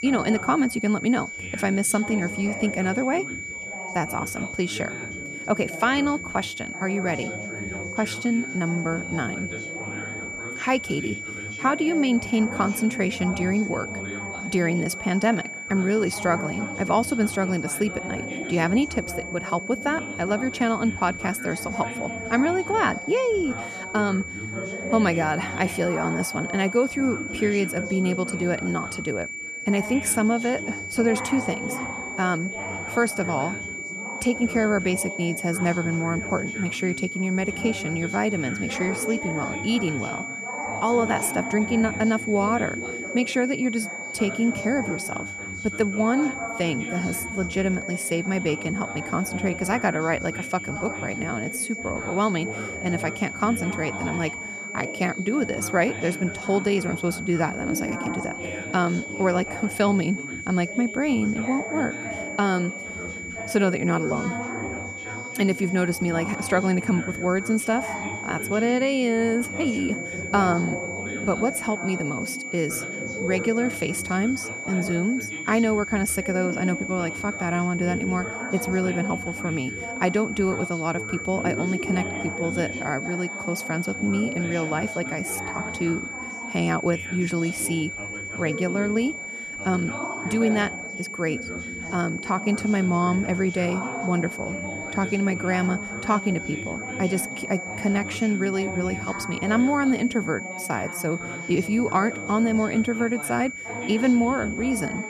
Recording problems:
high-pitched whine; loud; throughout; 2.5 kHz, 7 dB below the speech
background chatter; noticeable; throughout; 4 voices, 10 dB below the speech

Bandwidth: 14.5 kHz